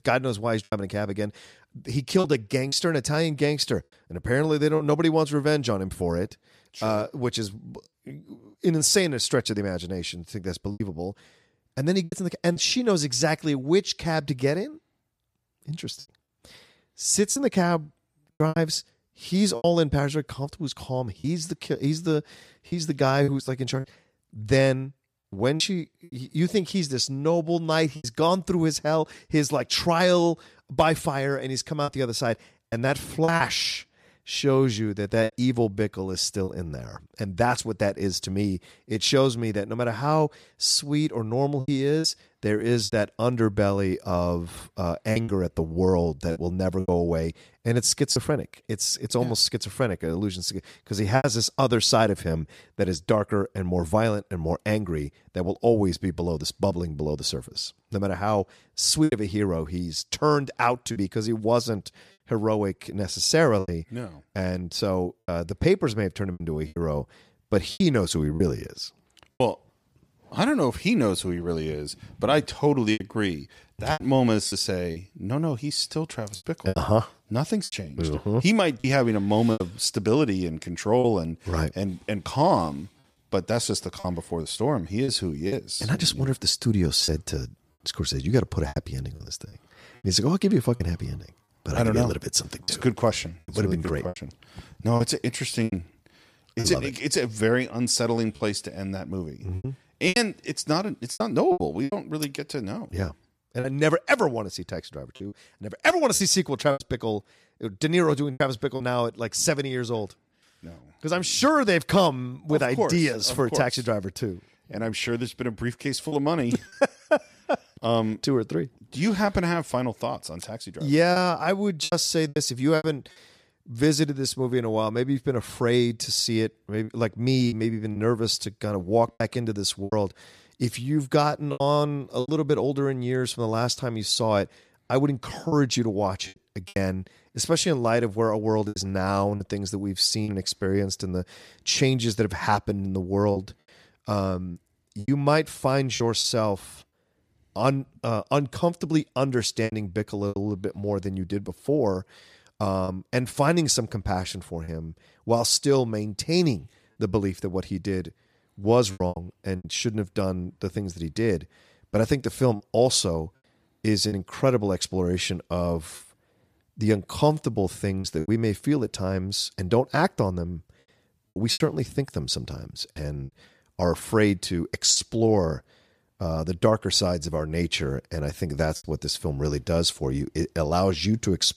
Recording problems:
choppy; occasionally; 5% of the speech affected

